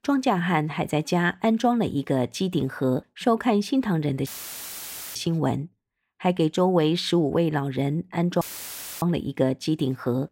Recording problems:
audio cutting out; filled with static; at 4.5 s for 1 s and at 8.5 s for 0.5 s

